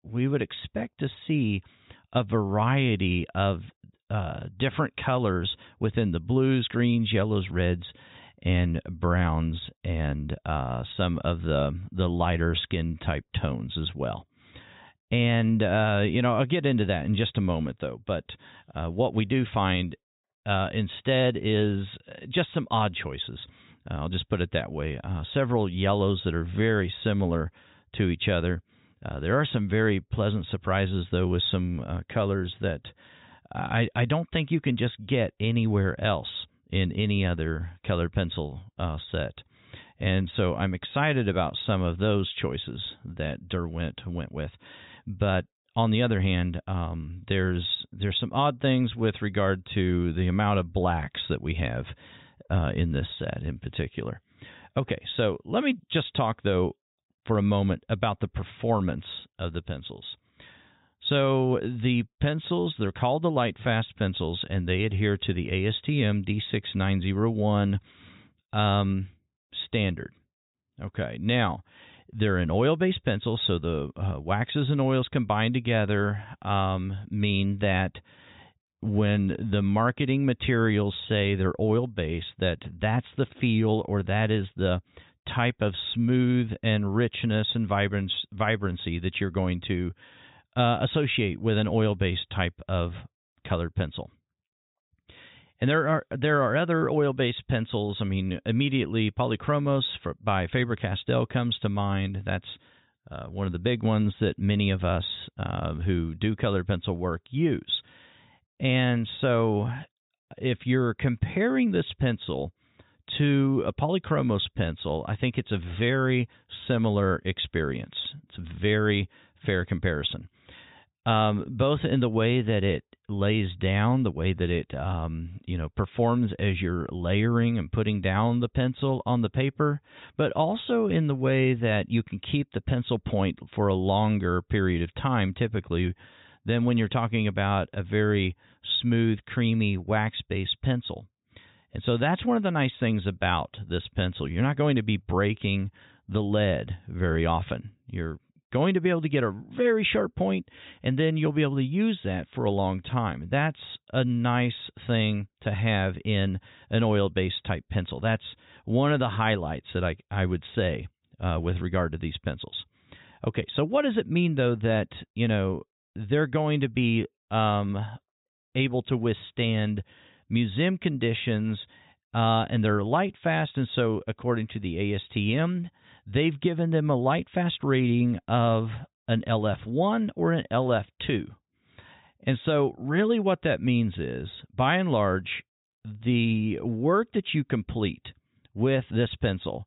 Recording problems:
high frequencies cut off; severe; nothing above 4 kHz

